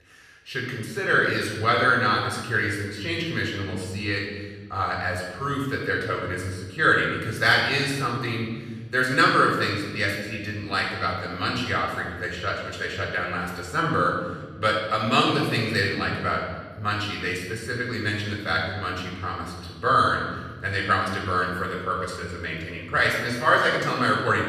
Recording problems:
off-mic speech; far
room echo; noticeable; dies away in 1.4 s

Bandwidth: 13.5 kHz